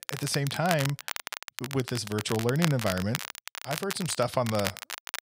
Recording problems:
crackle, like an old record; loud; 6 dB below the speech

